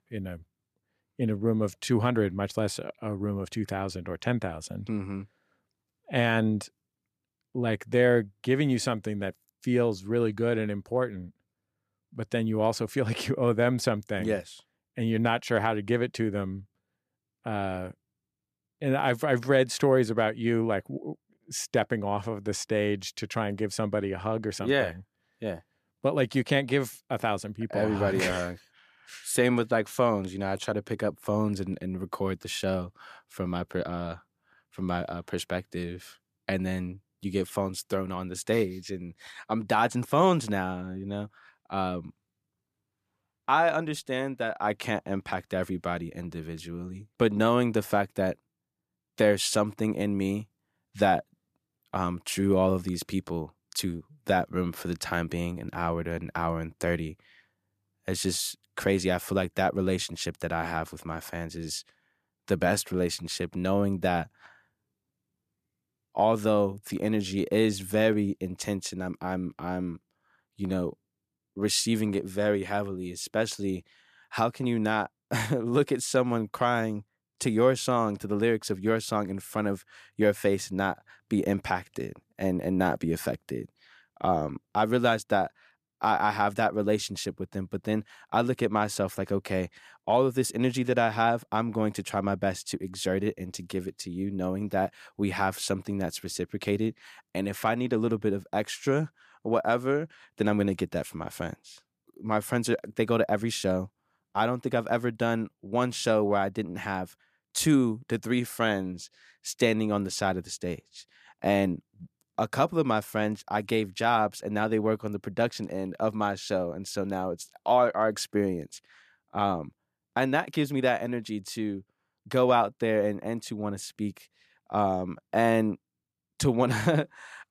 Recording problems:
none

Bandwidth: 14.5 kHz